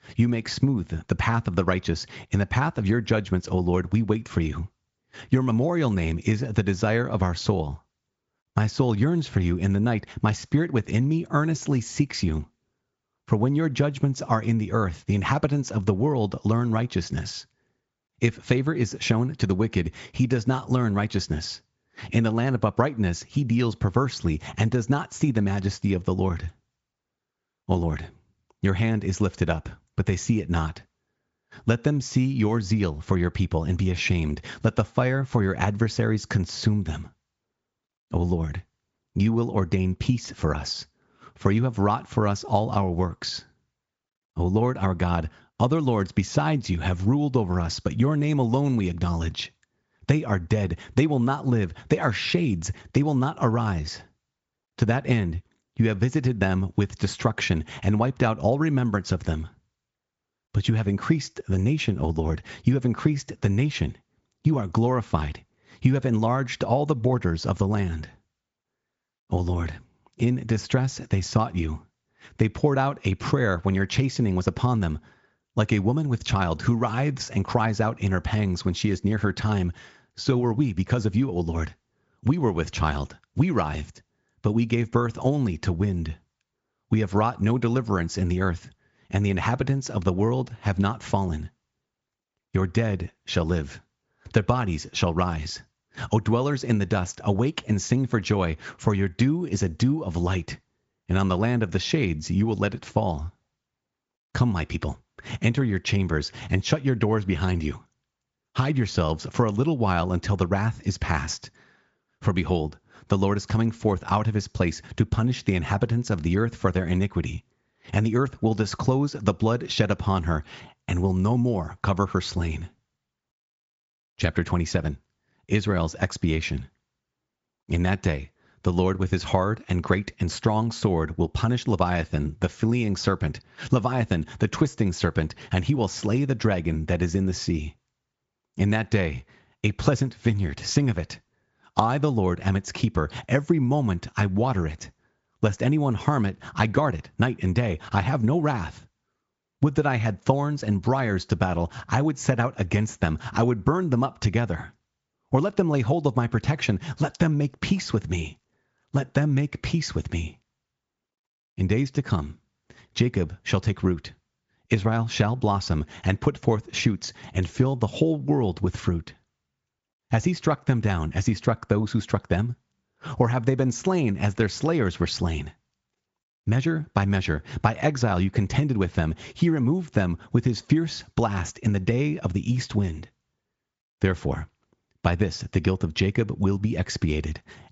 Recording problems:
high frequencies cut off; noticeable; nothing above 7.5 kHz
garbled, watery; slightly
squashed, flat; somewhat

